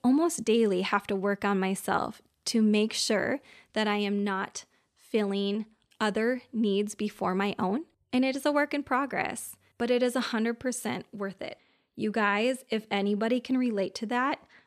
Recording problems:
none

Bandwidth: 13.5 kHz